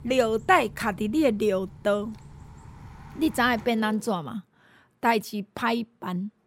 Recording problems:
traffic noise; faint; until 4 s; 20 dB below the speech

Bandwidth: 16 kHz